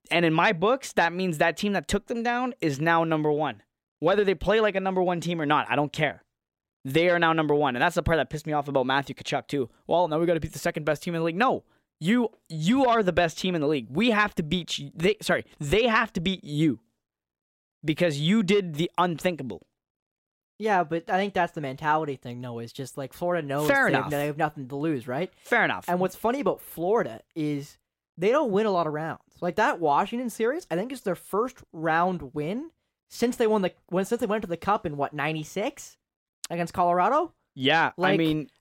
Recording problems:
none

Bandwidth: 16 kHz